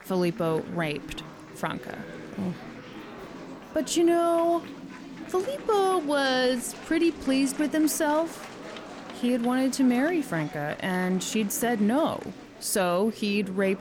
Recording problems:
chatter from many people; noticeable; throughout; 15 dB below the speech

